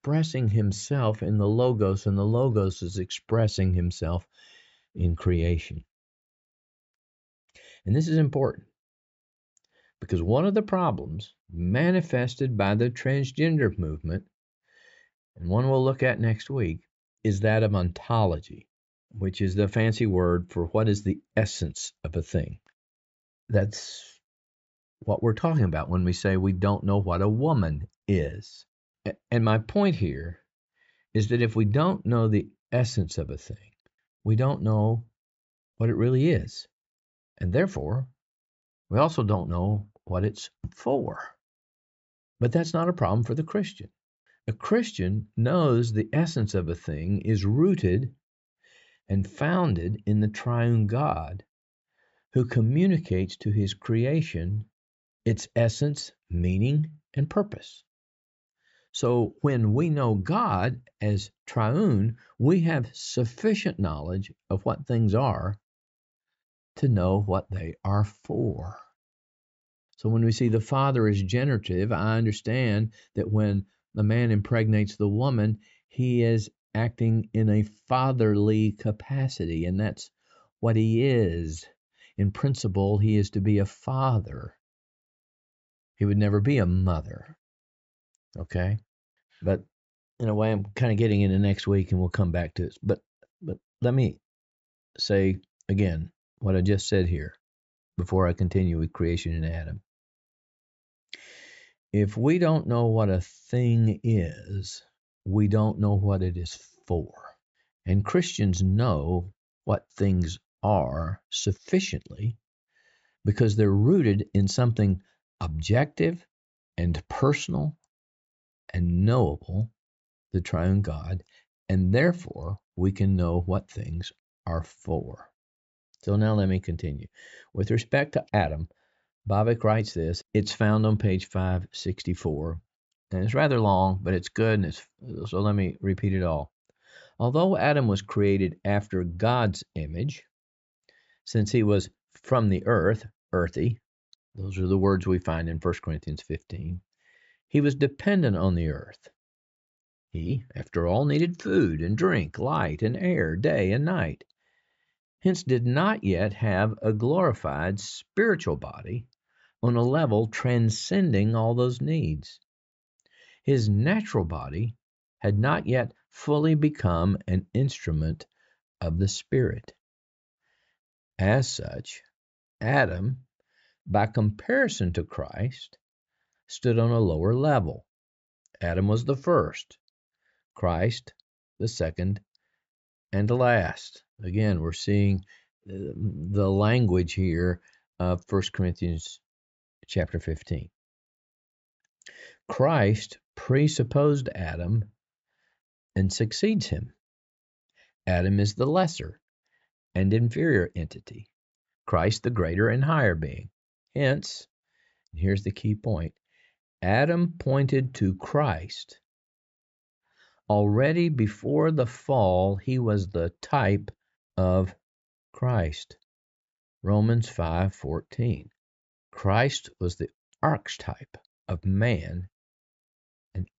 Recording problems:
high frequencies cut off; noticeable; nothing above 8 kHz

